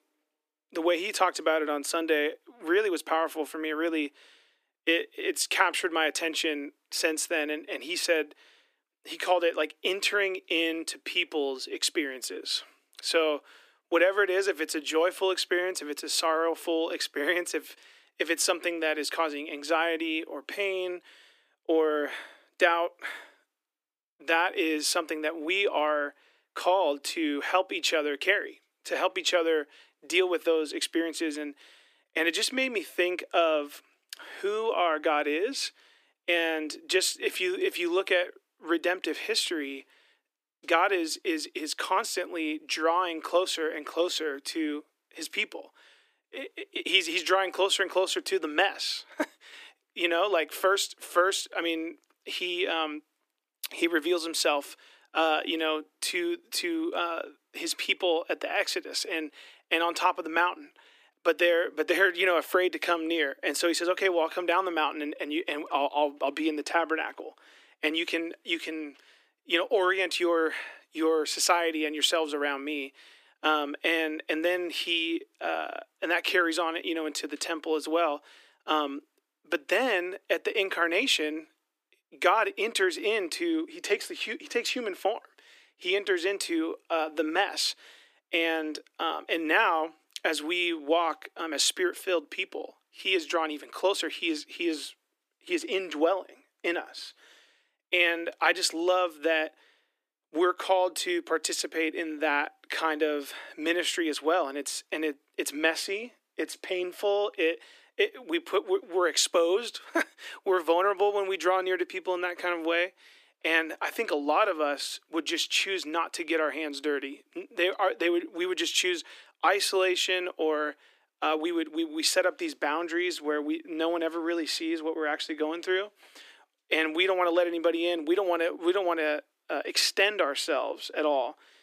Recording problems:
thin; somewhat; fading below 300 Hz

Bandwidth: 15 kHz